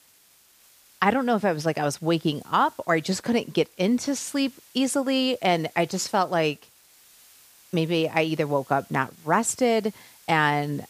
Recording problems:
hiss; faint; throughout; 25 dB below the speech

